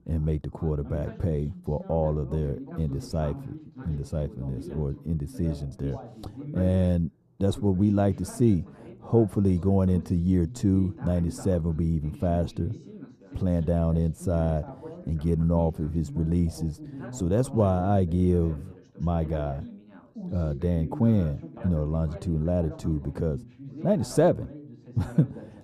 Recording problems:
muffled; very; fading above 1.5 kHz
background chatter; noticeable; throughout; 2 voices, 15 dB below the speech

